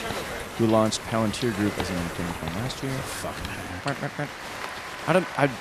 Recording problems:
crowd noise; loud; throughout; 6 dB below the speech

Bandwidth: 14.5 kHz